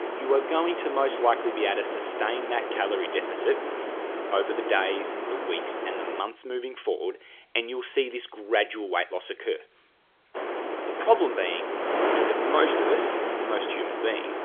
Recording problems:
phone-call audio; nothing above 3.5 kHz
wind noise on the microphone; heavy; until 6 s and from 10 s on; 2 dB below the speech

